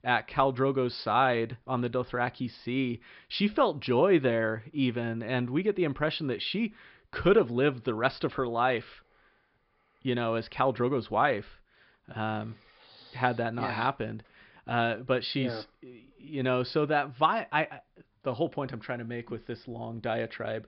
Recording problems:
high frequencies cut off; noticeable; nothing above 5 kHz

